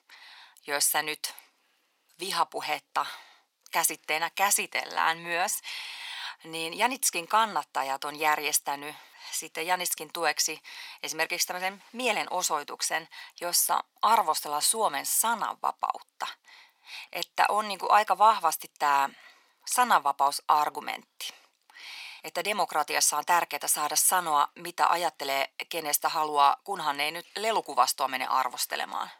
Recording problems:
thin; very; fading below 550 Hz

